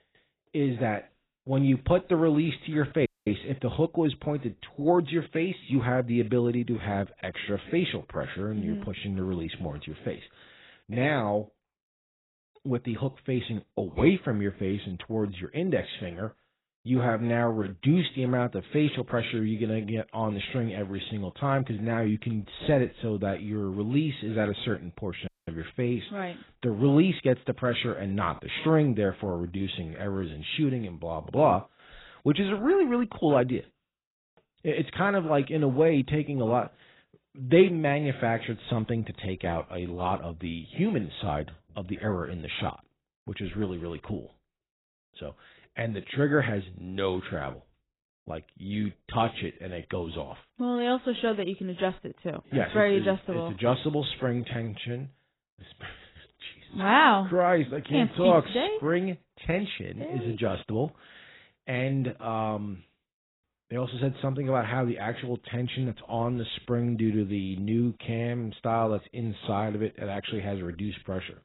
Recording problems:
garbled, watery; badly; nothing above 4 kHz
audio cutting out; at 3 s and at 25 s

